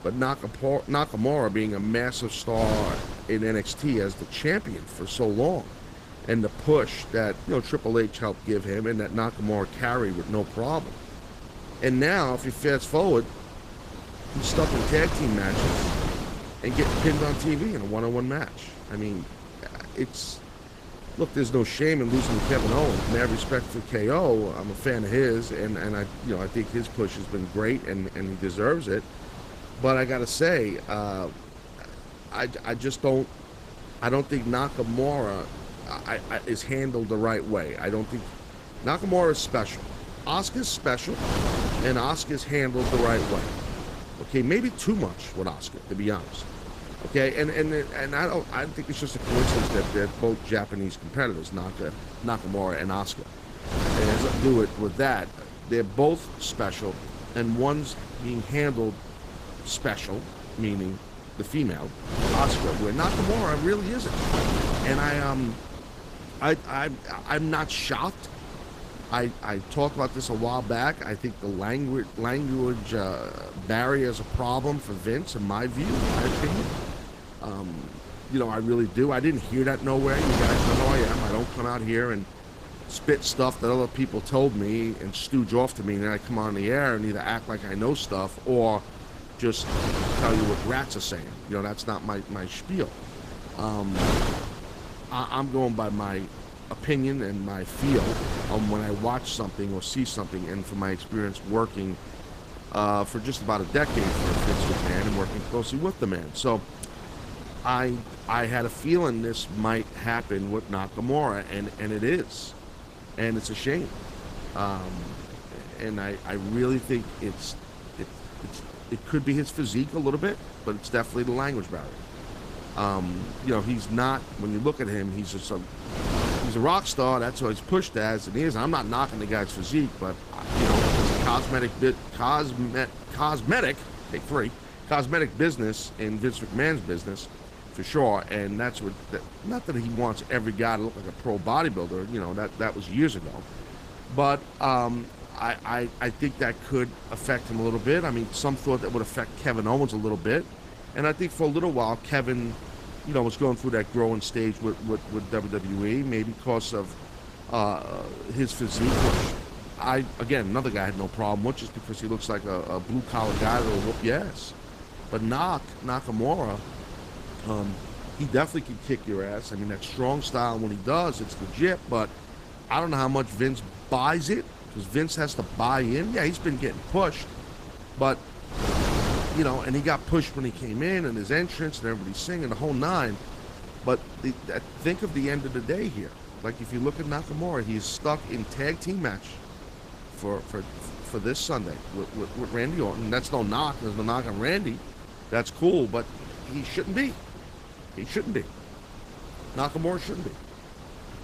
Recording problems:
garbled, watery; slightly; nothing above 15 kHz
wind noise on the microphone; heavy; 8 dB below the speech

